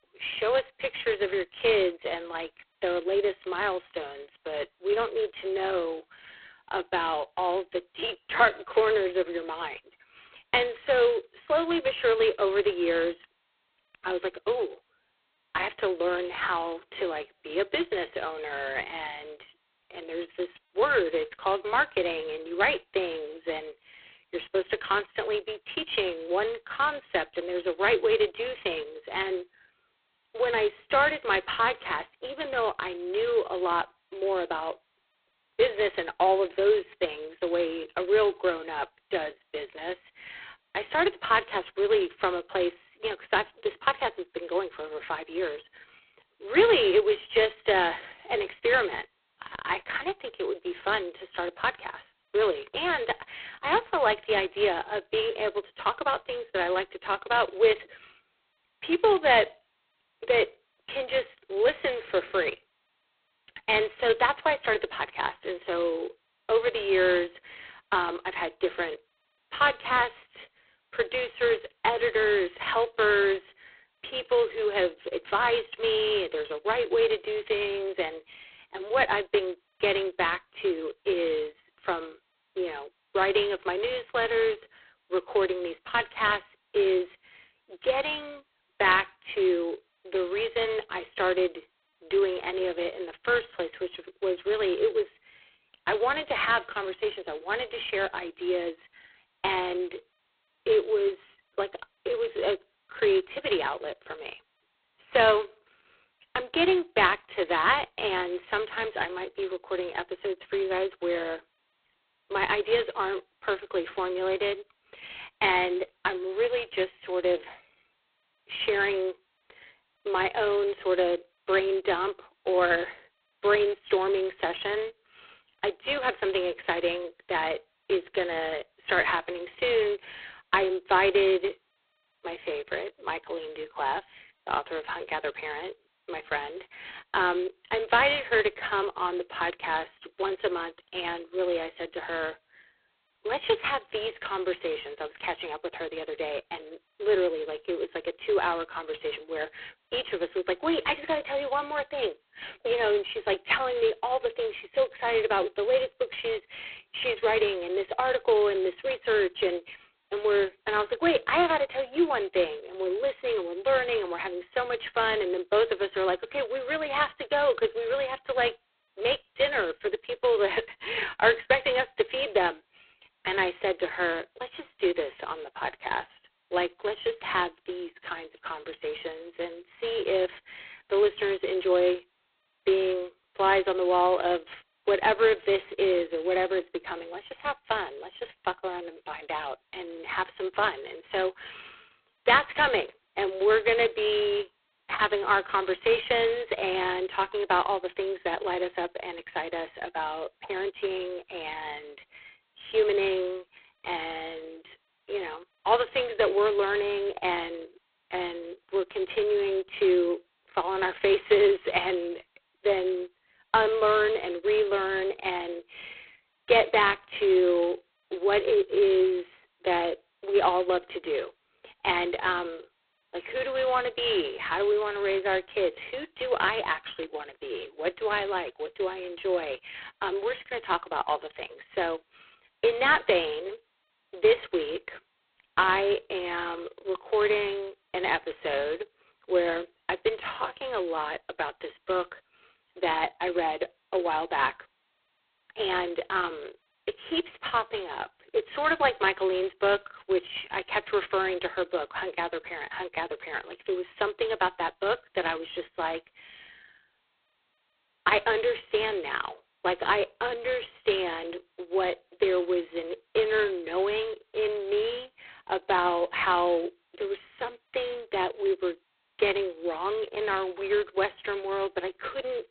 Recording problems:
phone-call audio; poor line; nothing above 4 kHz

